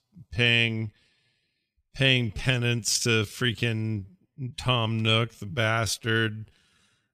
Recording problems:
wrong speed, natural pitch; too slow; 0.7 times normal speed

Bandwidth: 14.5 kHz